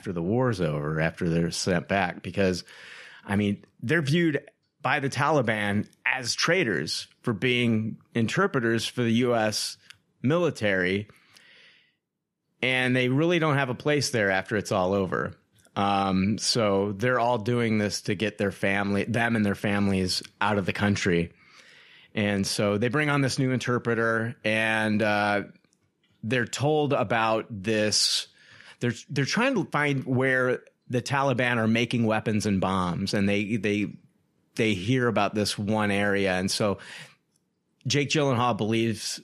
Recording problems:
none

